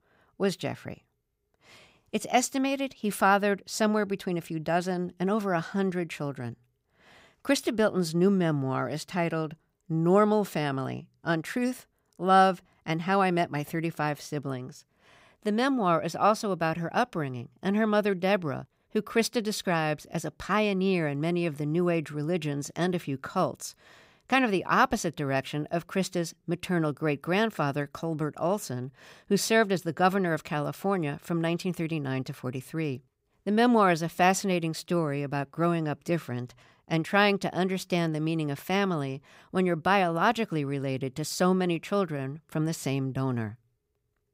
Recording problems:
none

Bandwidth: 15.5 kHz